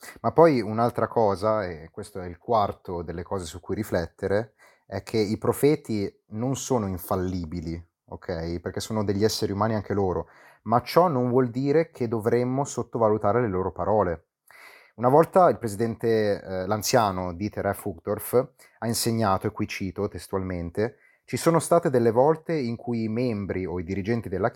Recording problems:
none

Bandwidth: 17.5 kHz